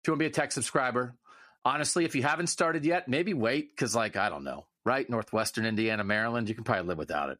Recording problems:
squashed, flat; somewhat

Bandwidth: 14.5 kHz